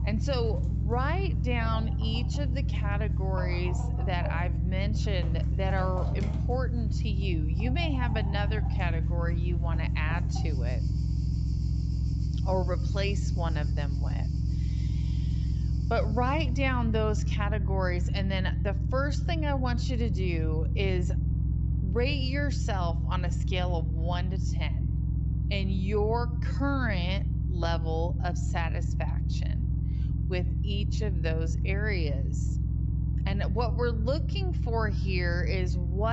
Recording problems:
wrong speed, natural pitch; too slow; 0.7 times normal speed
high frequencies cut off; noticeable; nothing above 7.5 kHz
low rumble; loud; throughout; 9 dB below the speech
animal sounds; noticeable; until 16 s; 15 dB below the speech
abrupt cut into speech; at the end

